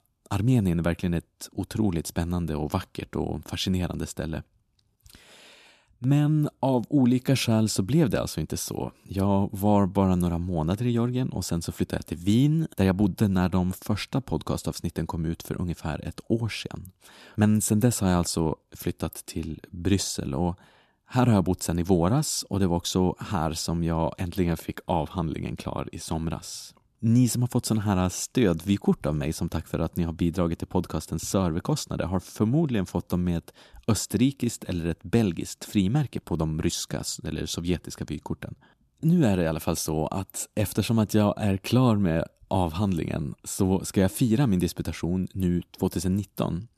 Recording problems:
none

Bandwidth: 14 kHz